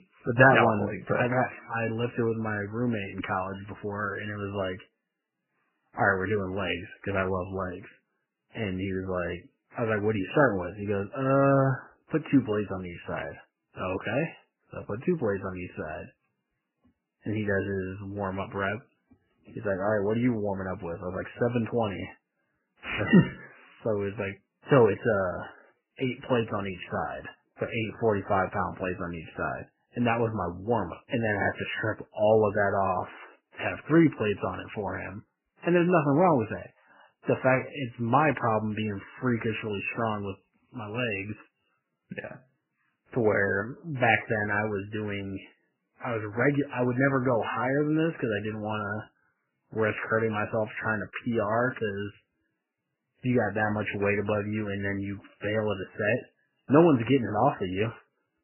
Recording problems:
garbled, watery; badly; nothing above 3 kHz

